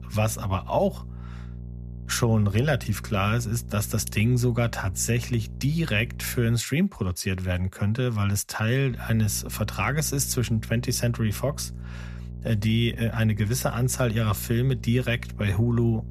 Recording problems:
electrical hum; faint; until 6.5 s and from 9 s on; 60 Hz, 20 dB below the speech

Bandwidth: 14.5 kHz